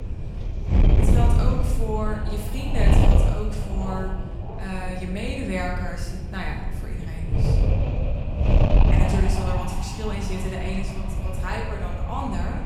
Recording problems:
off-mic speech; far
room echo; noticeable; dies away in 1.1 s
wind noise on the microphone; heavy; 1 dB below the speech

